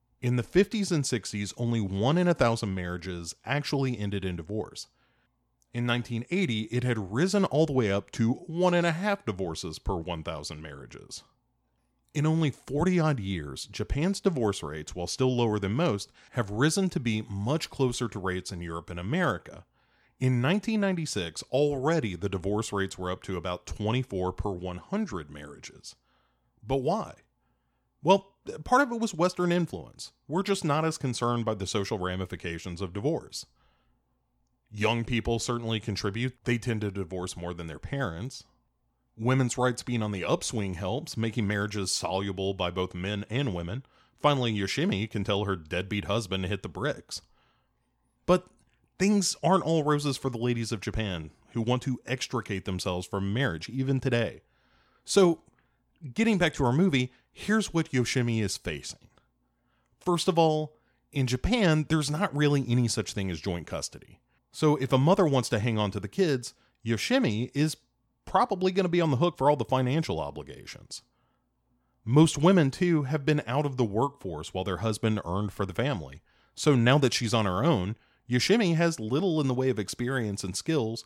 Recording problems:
none

